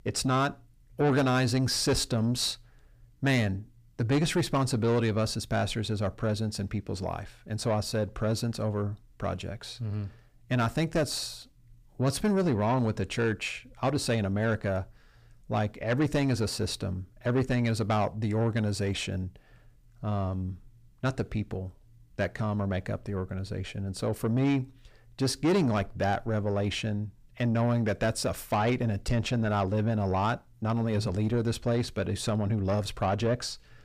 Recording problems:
distortion; slight; 10 dB below the speech

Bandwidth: 15 kHz